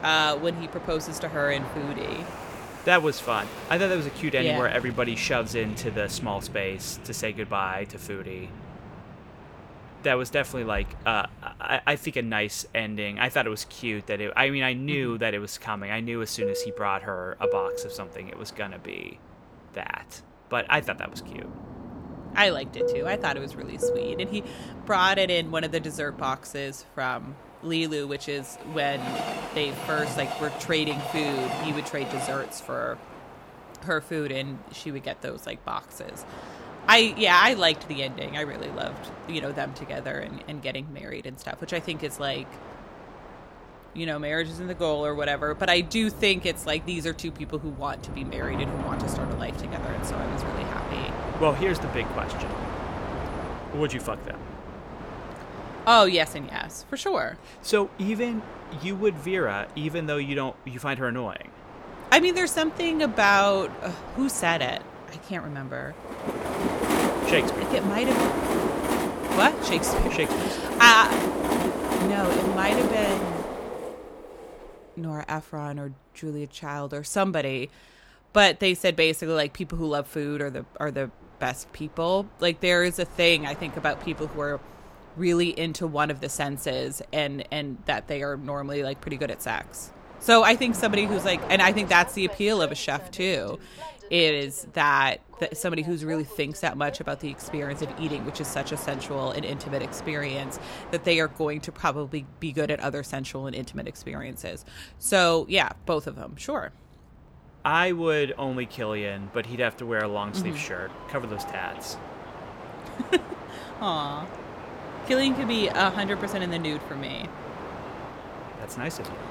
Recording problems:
train or aircraft noise; loud; throughout; 8 dB below the speech

